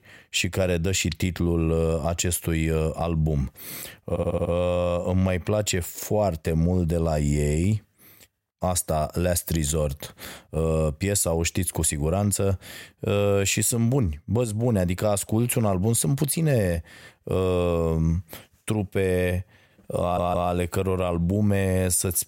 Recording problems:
audio stuttering; at 4 s and at 20 s

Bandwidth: 16 kHz